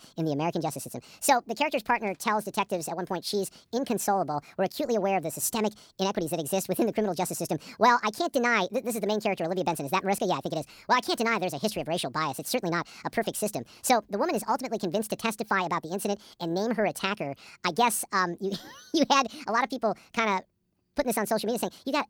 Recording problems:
wrong speed and pitch; too fast and too high; 1.5 times normal speed

